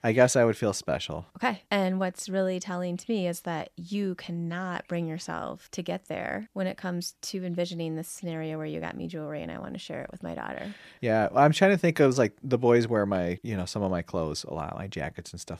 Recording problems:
none

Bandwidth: 14.5 kHz